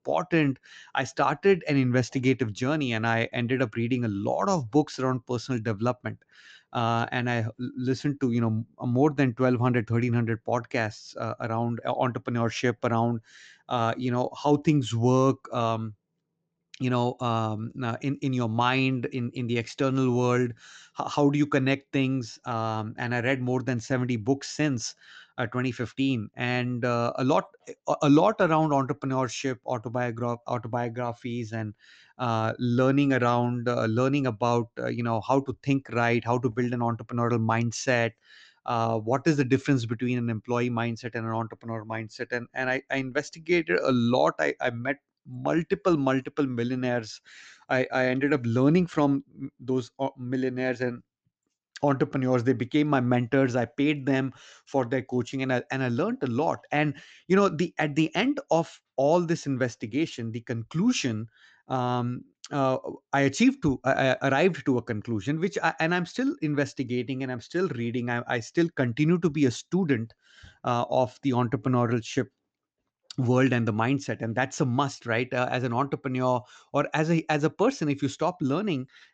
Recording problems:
high frequencies cut off; noticeable; nothing above 8 kHz

